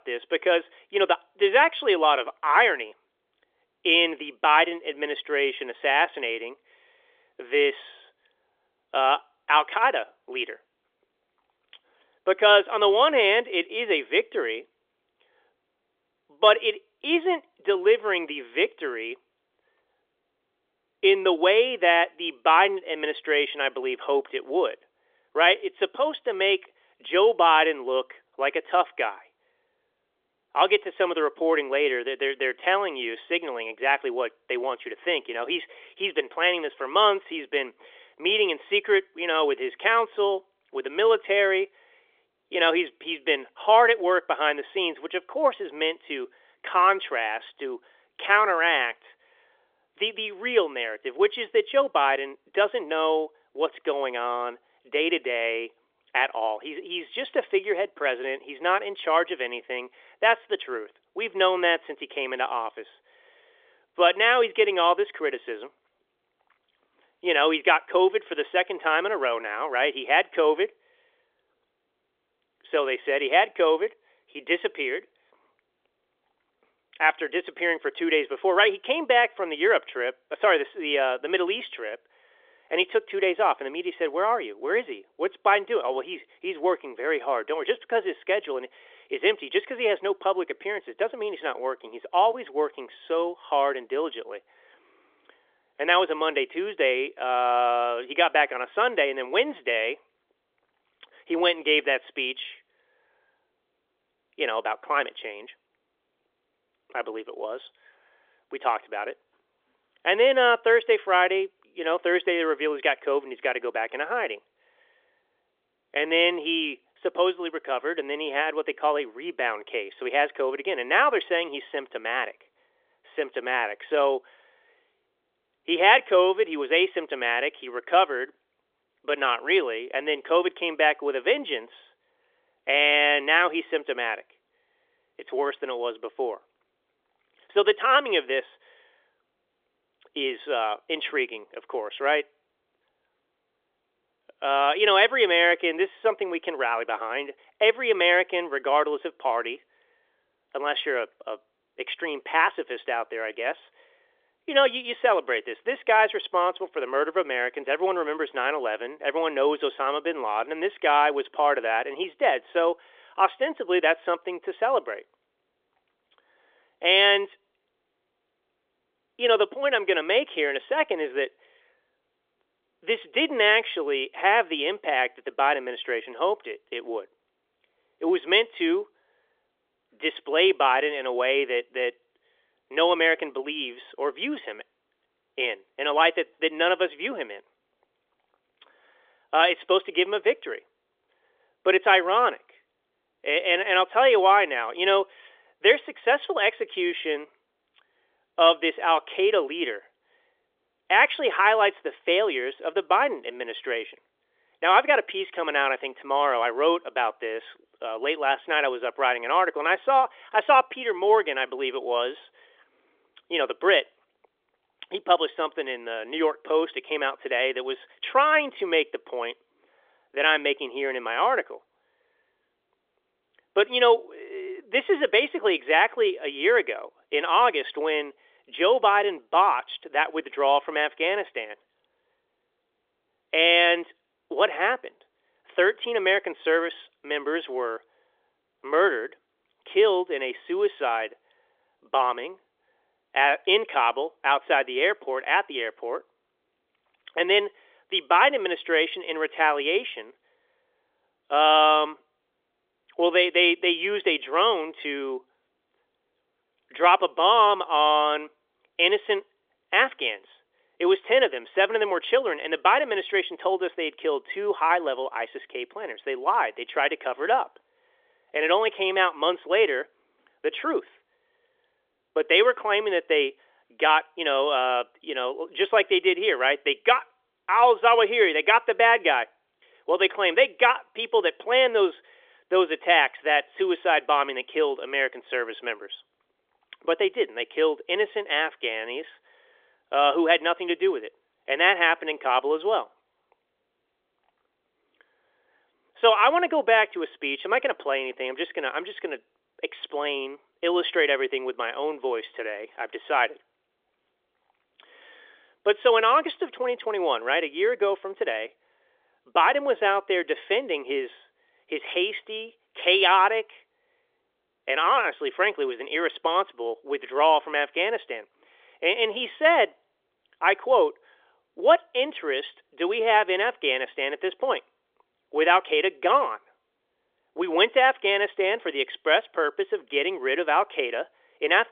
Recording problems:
phone-call audio; nothing above 3.5 kHz

